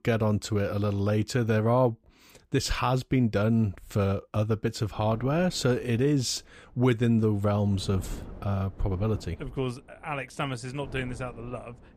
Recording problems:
wind noise on the microphone; occasional gusts; from 5 s on; 20 dB below the speech

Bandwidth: 15 kHz